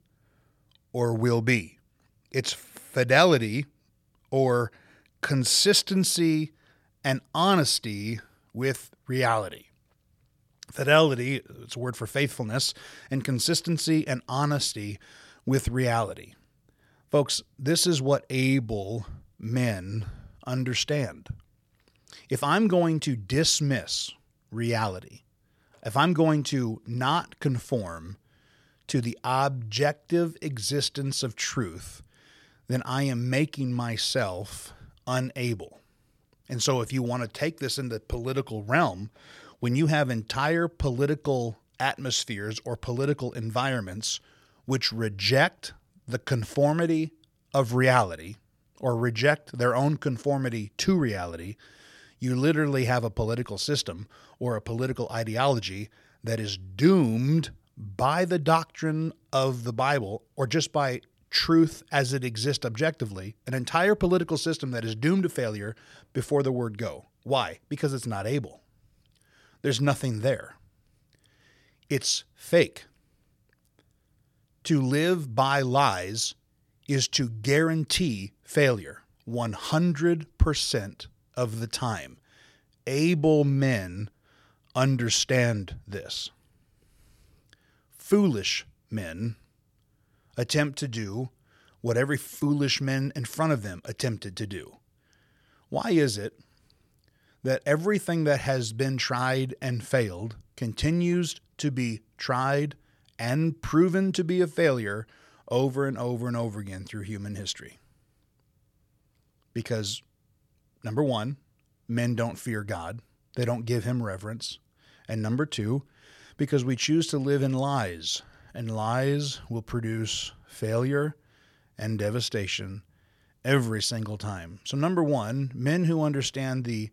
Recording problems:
none

